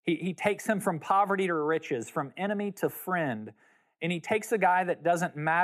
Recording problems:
abrupt cut into speech; at the end

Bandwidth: 14.5 kHz